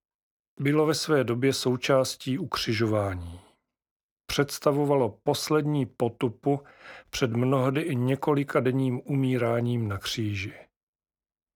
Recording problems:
none

